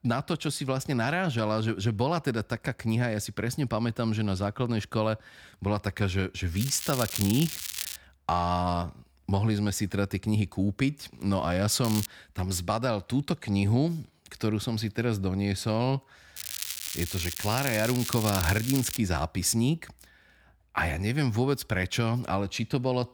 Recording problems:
crackling; loud; from 6.5 to 8 s, at 12 s and from 16 to 19 s; 5 dB below the speech

